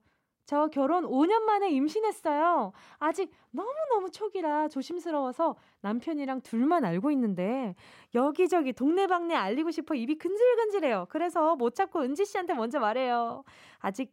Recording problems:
none

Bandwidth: 16 kHz